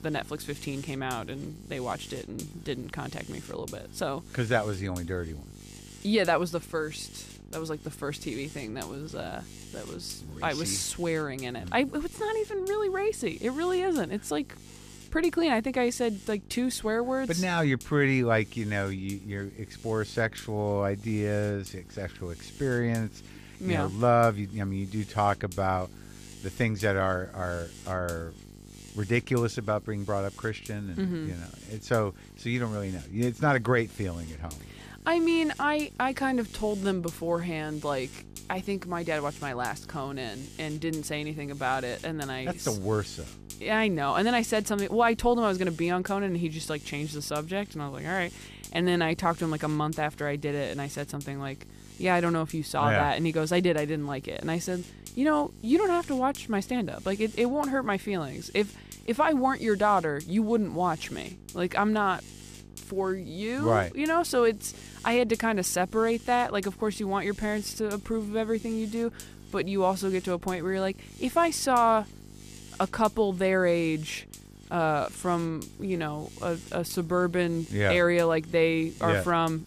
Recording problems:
electrical hum; faint; throughout; 50 Hz, 20 dB below the speech

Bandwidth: 14.5 kHz